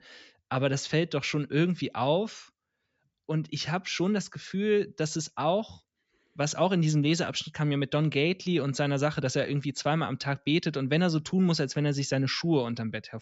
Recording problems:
high frequencies cut off; noticeable; nothing above 8 kHz

